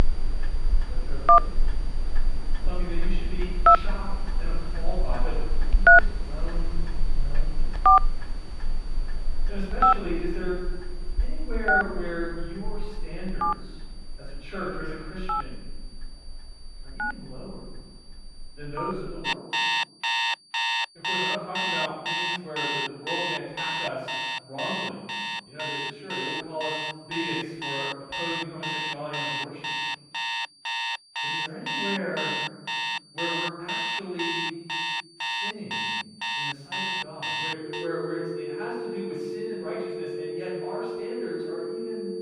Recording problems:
room echo; strong; dies away in 1.4 s
off-mic speech; far
alarms or sirens; very loud; throughout; 9 dB above the speech
high-pitched whine; noticeable; throughout; 4.5 kHz, 15 dB below the speech

